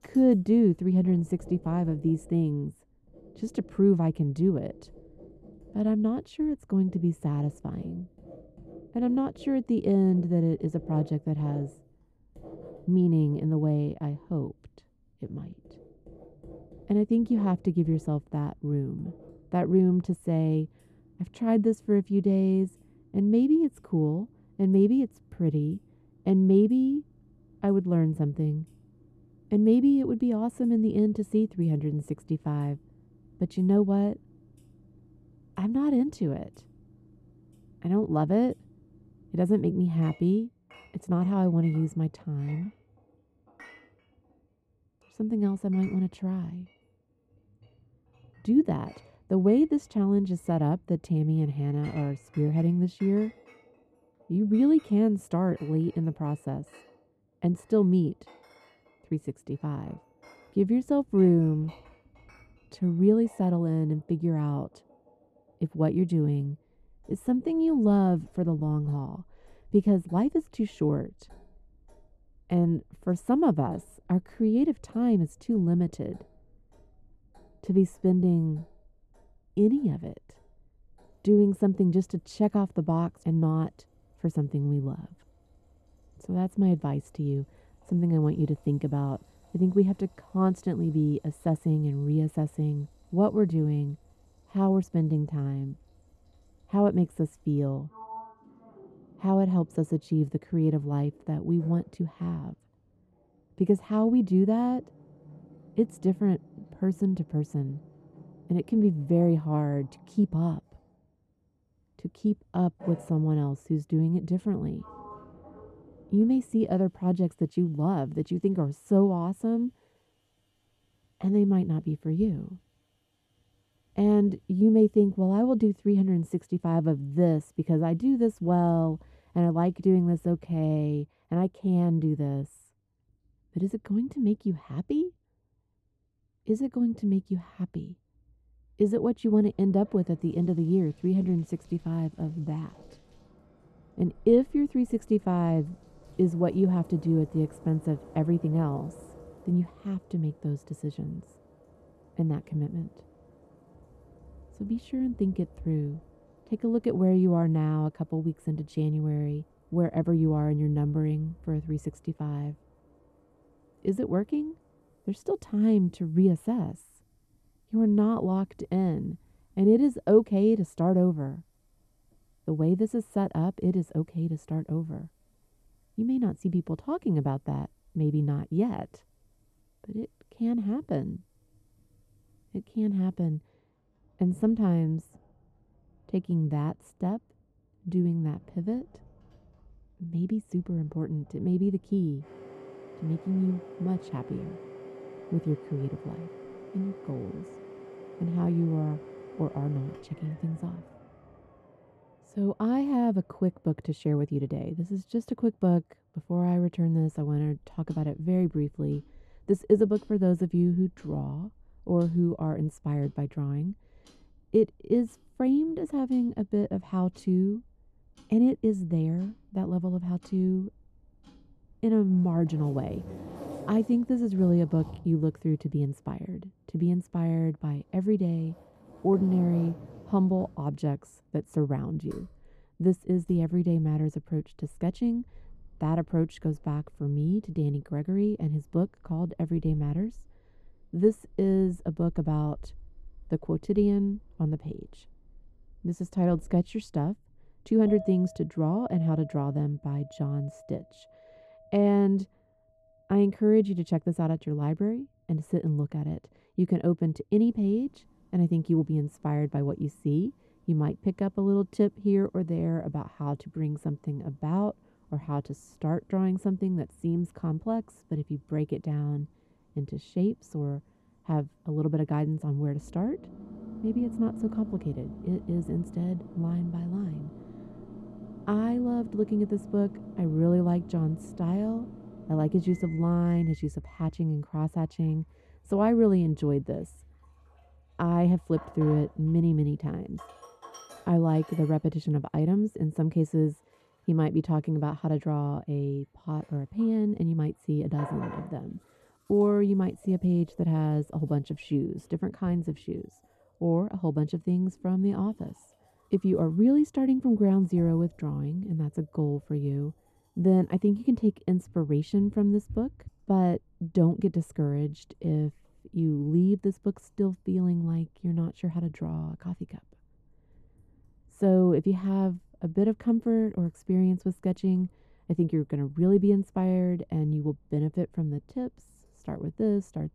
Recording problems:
muffled; very; fading above 1 kHz
household noises; faint; throughout; 25 dB below the speech

